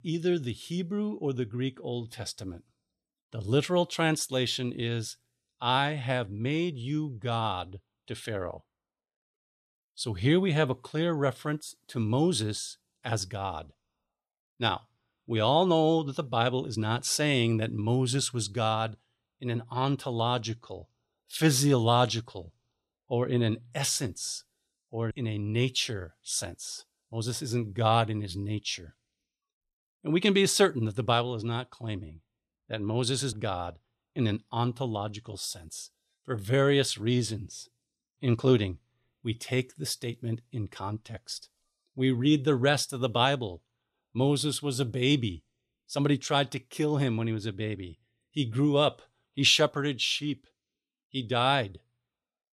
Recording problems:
none

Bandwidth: 14.5 kHz